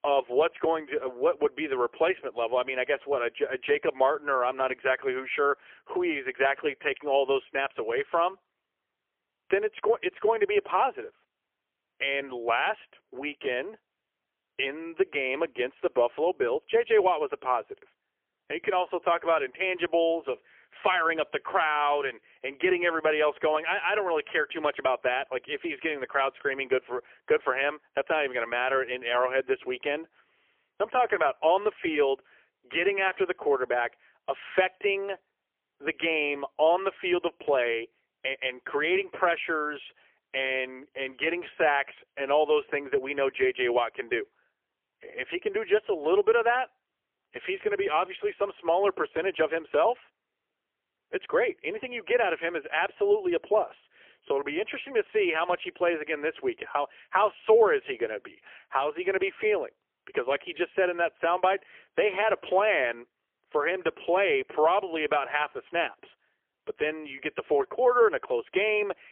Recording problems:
phone-call audio; poor line; nothing above 3 kHz

